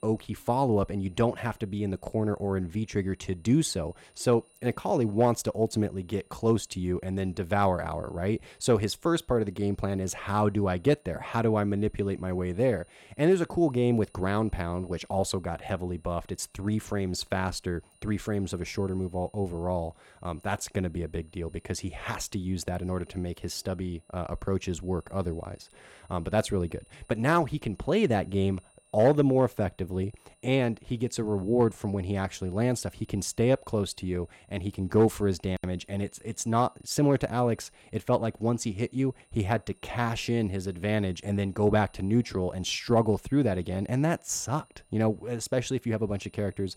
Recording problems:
high-pitched whine; faint; throughout; 9.5 kHz, 35 dB below the speech

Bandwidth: 16.5 kHz